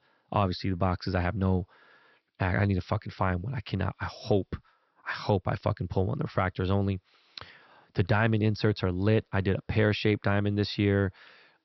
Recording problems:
high frequencies cut off; noticeable; nothing above 5.5 kHz

